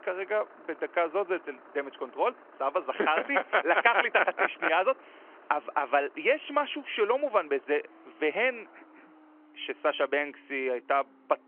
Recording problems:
phone-call audio; nothing above 3 kHz
traffic noise; faint; throughout; 25 dB below the speech

